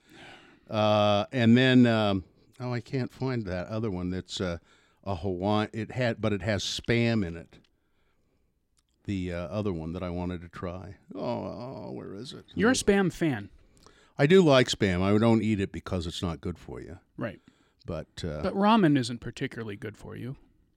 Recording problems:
none

